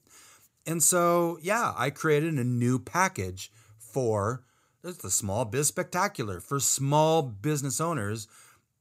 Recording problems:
none

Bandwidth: 15.5 kHz